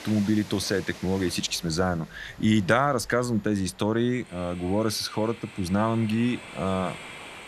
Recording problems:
train or aircraft noise; noticeable; throughout; 15 dB below the speech

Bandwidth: 14 kHz